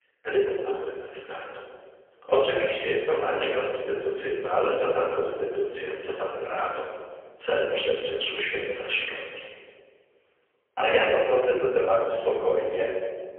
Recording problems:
phone-call audio; poor line; nothing above 3.5 kHz
off-mic speech; far
room echo; noticeable; dies away in 1.4 s

